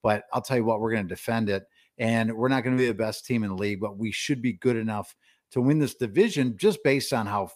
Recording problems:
none

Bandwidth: 15 kHz